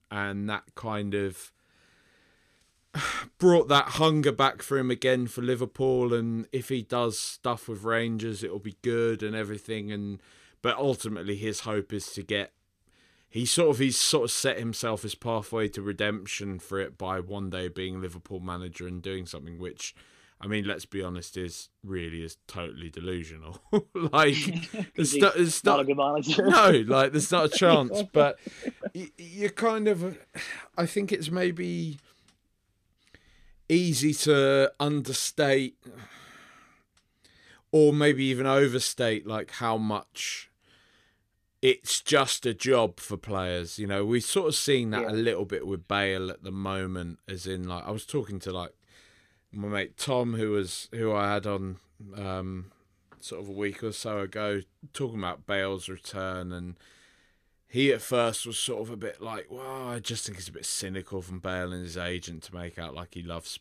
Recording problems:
none

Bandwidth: 14.5 kHz